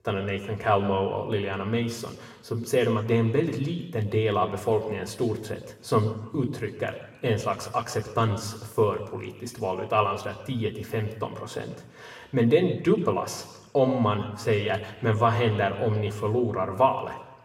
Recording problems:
room echo; slight; dies away in 1 s
off-mic speech; somewhat distant

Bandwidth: 16 kHz